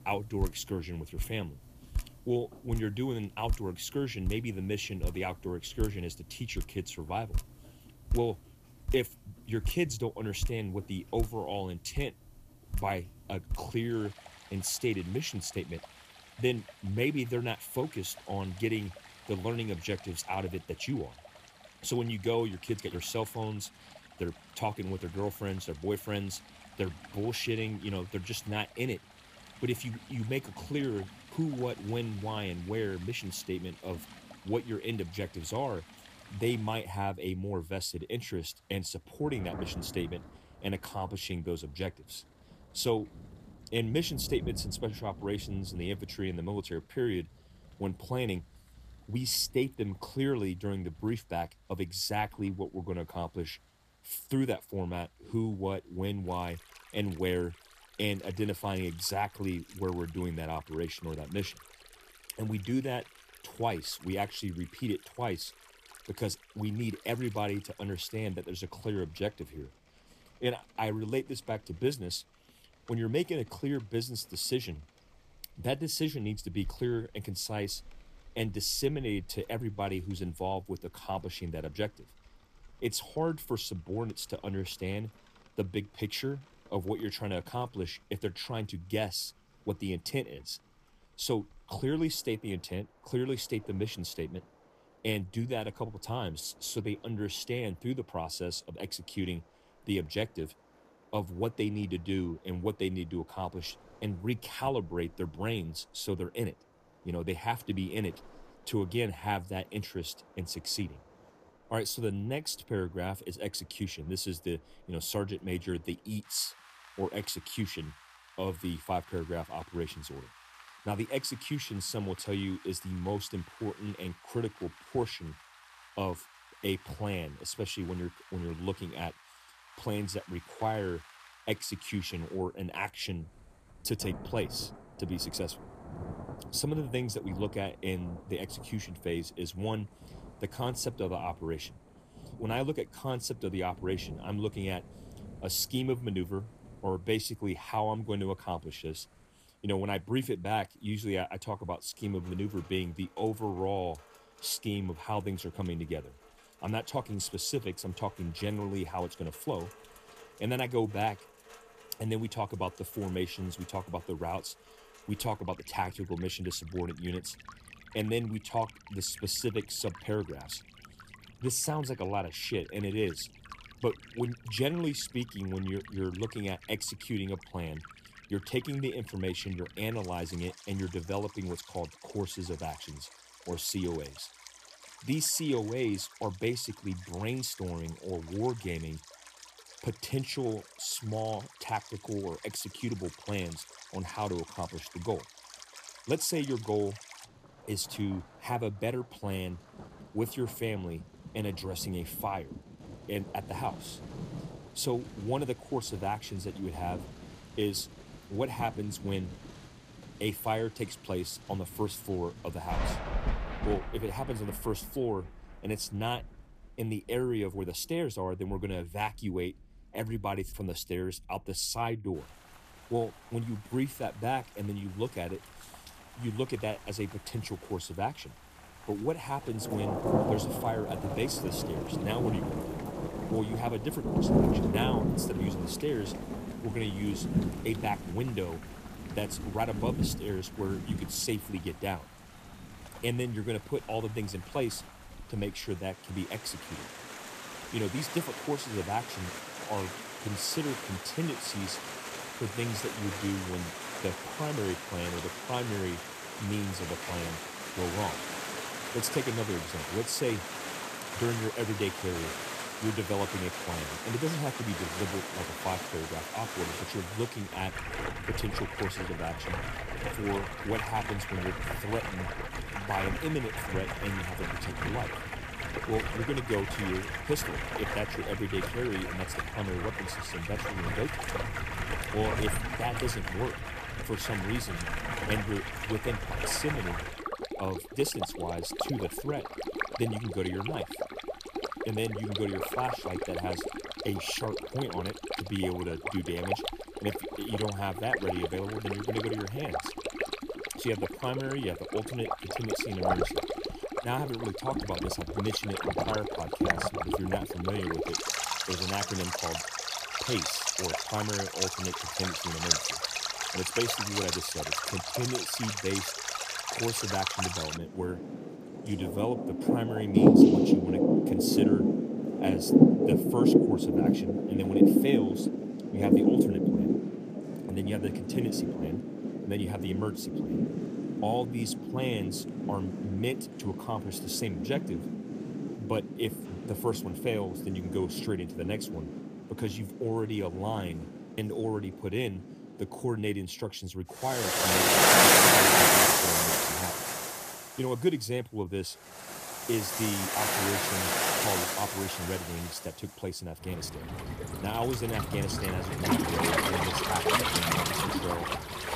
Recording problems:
rain or running water; very loud; throughout; 4 dB above the speech

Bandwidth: 14.5 kHz